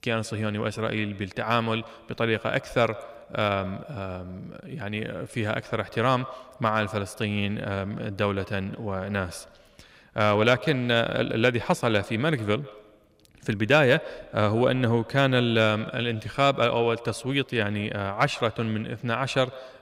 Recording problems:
echo of what is said; faint; throughout; 140 ms later, 20 dB below the speech

